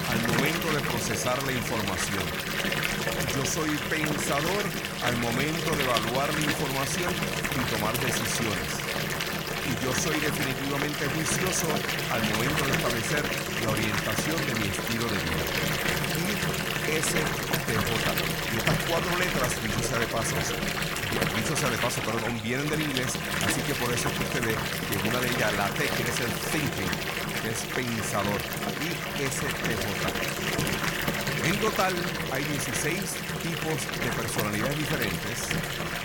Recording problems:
household noises; very loud; throughout; 3 dB above the speech

